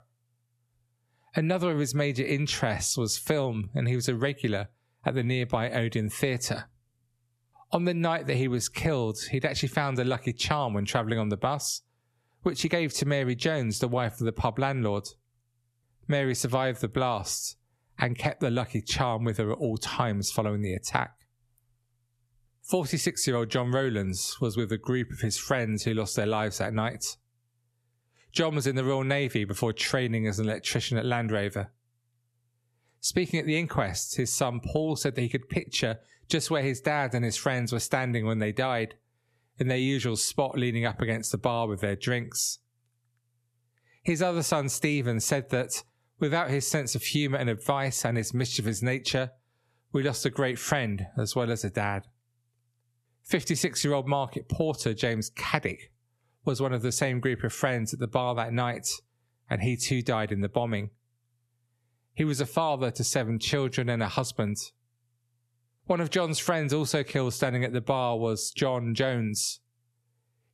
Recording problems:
squashed, flat; heavily

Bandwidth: 13.5 kHz